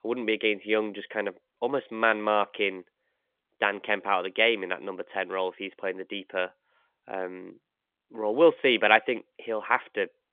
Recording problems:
phone-call audio; nothing above 3.5 kHz

